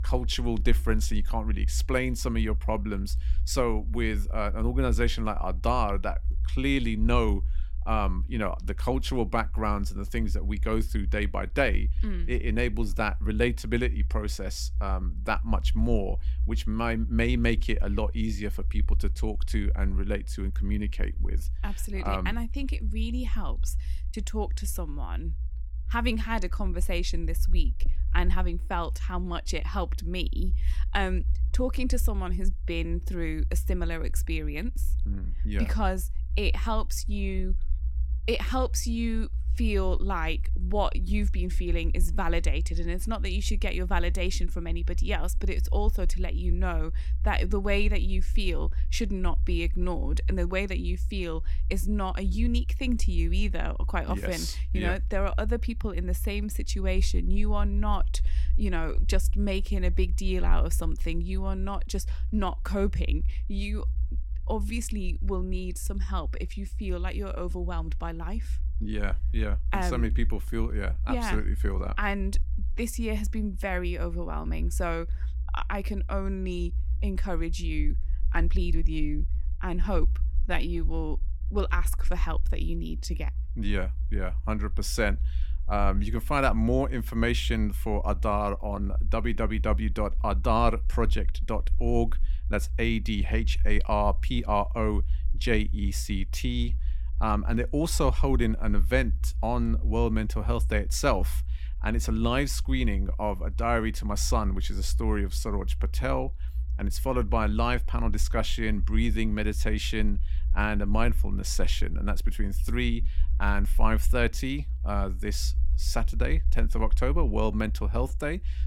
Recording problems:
low rumble; faint; throughout; 20 dB below the speech

